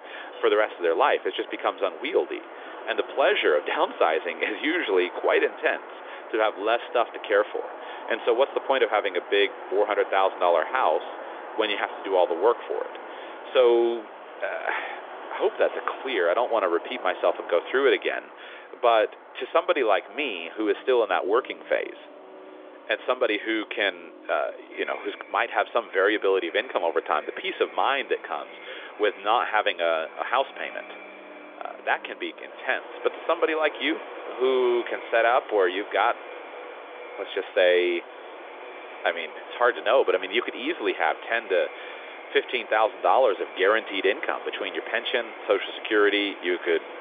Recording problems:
echo of what is said; faint; from 25 s on; 500 ms later, 20 dB below the speech
phone-call audio; nothing above 3.5 kHz
traffic noise; noticeable; throughout; 15 dB below the speech

